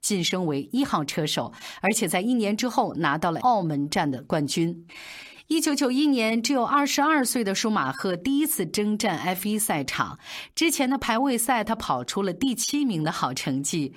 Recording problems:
none

